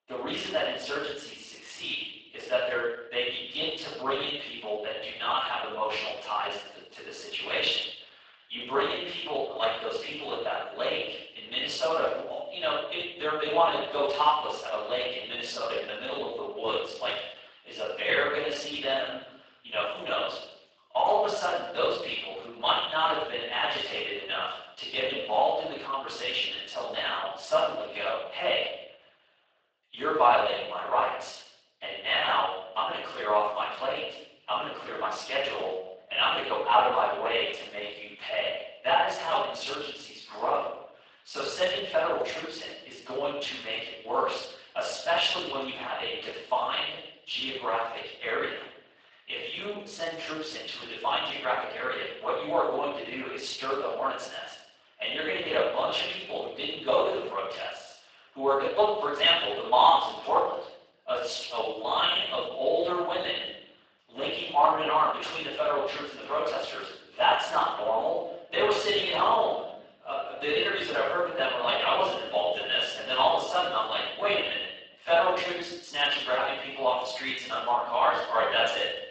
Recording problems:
room echo; strong; dies away in 0.8 s
off-mic speech; far
thin; somewhat; fading below 650 Hz
garbled, watery; slightly; nothing above 8 kHz

